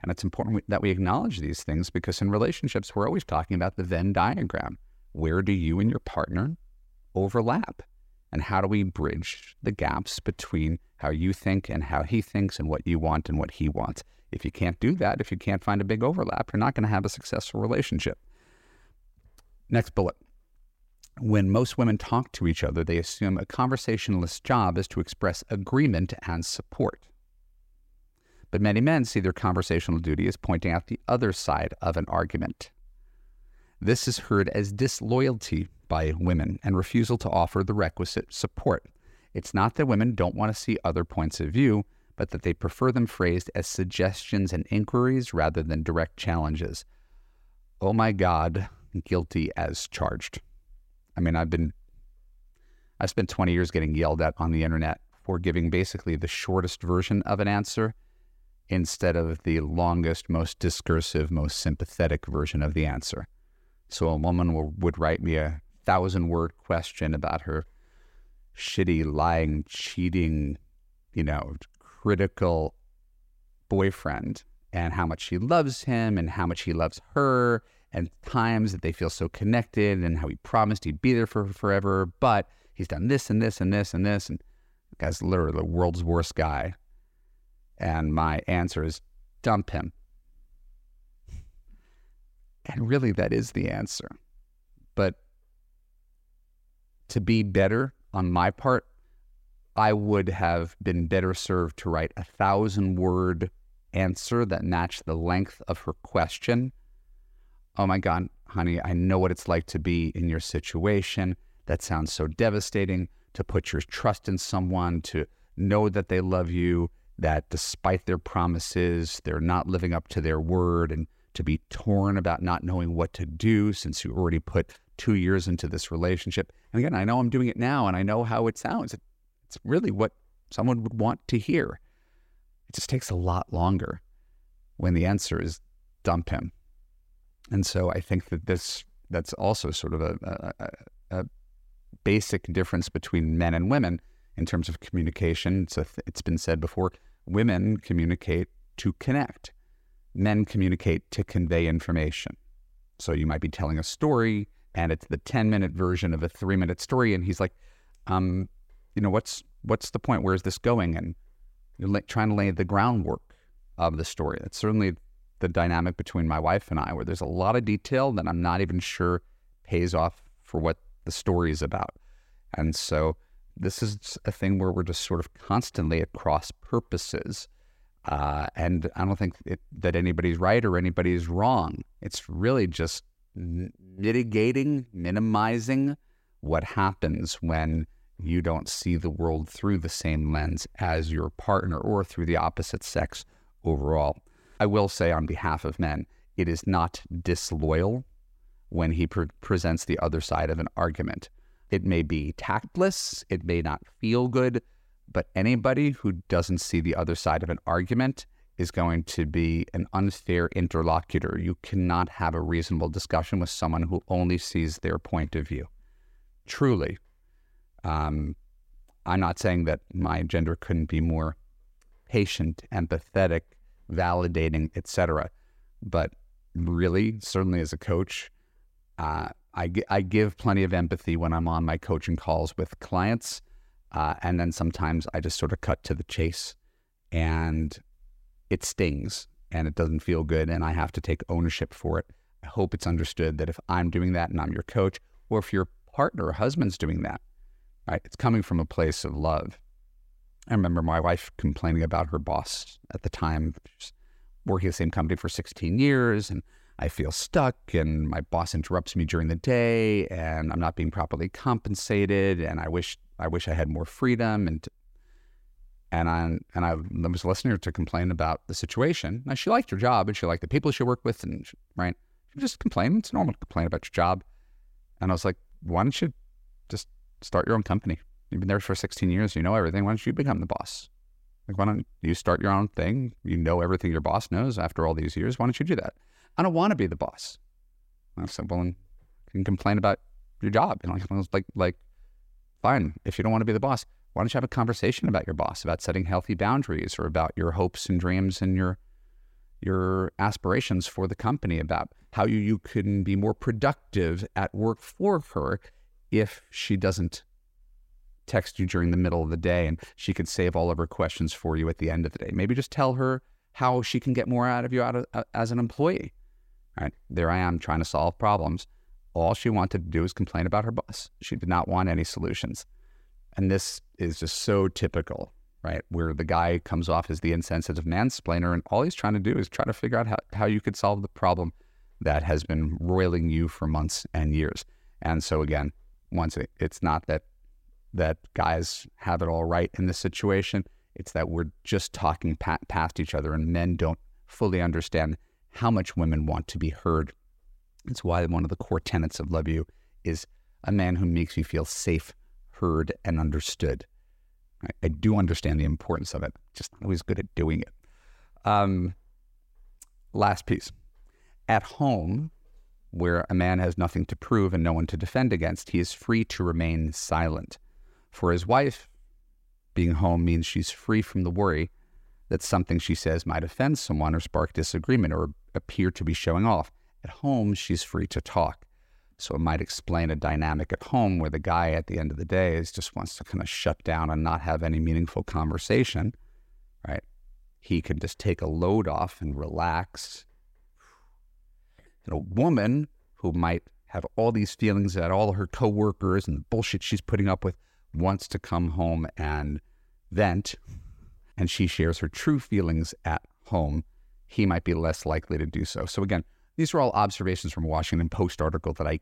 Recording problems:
none

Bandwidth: 16 kHz